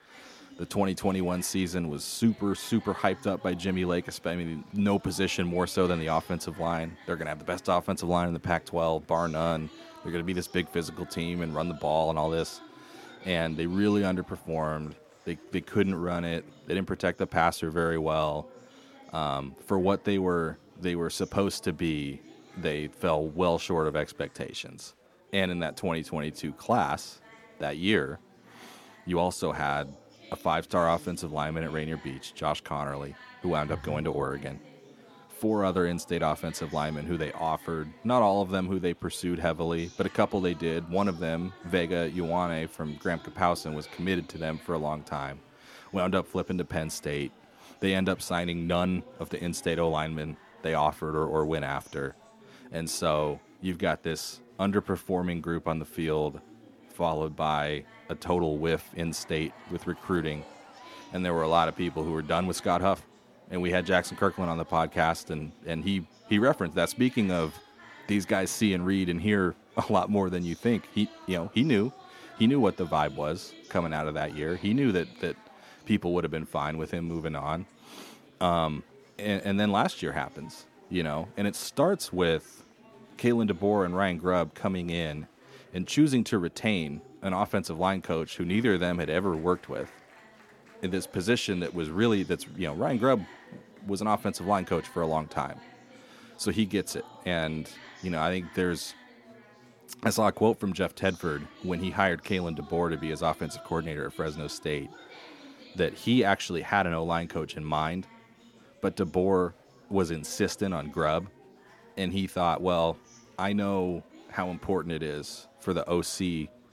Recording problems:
chatter from many people; faint; throughout; 20 dB below the speech

